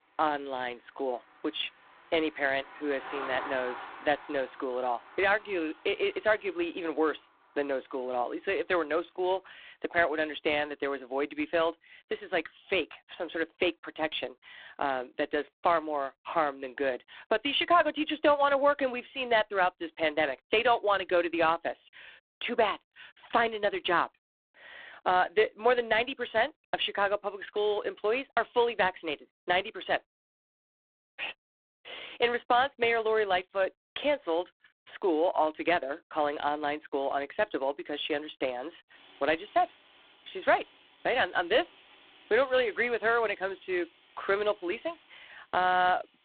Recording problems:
phone-call audio; poor line
traffic noise; noticeable; throughout; 20 dB below the speech

